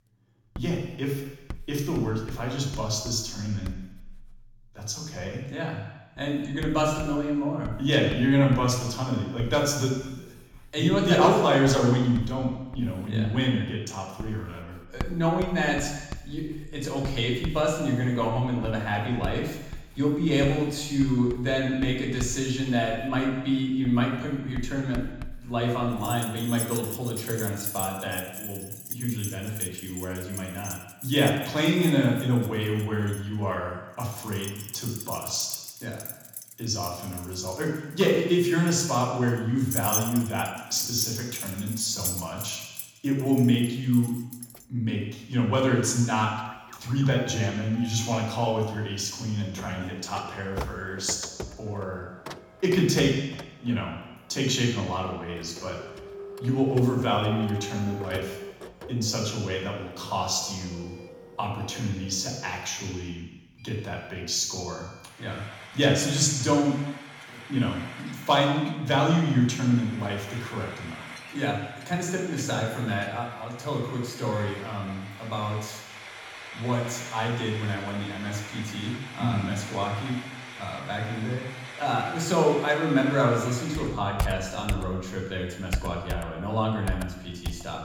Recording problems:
off-mic speech; far
room echo; noticeable; dies away in 1 s
household noises; noticeable; throughout; 10 dB below the speech

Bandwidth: 18 kHz